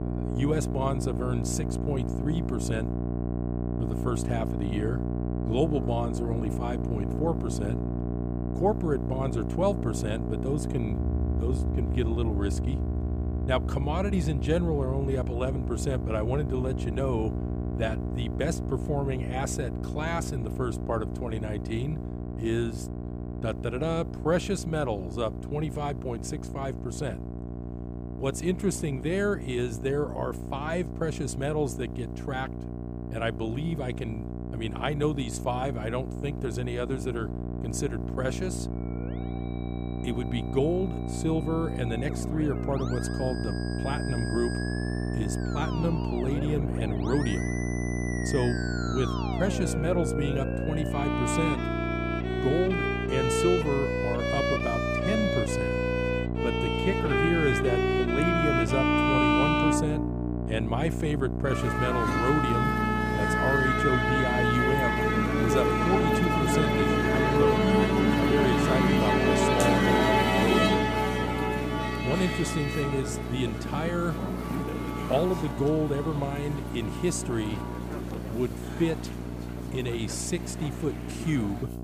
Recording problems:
background music; very loud; throughout; 2 dB above the speech
electrical hum; loud; throughout; 60 Hz, 6 dB below the speech

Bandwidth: 15 kHz